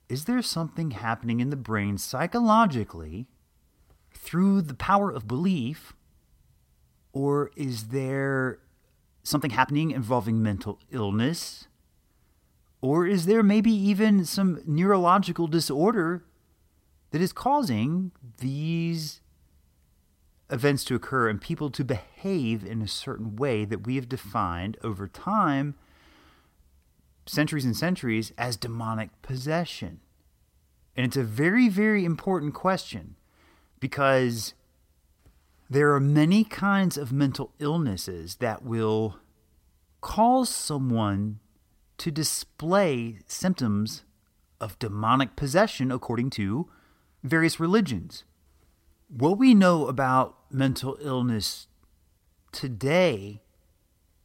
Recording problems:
uneven, jittery; strongly; from 2 to 53 s

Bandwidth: 16 kHz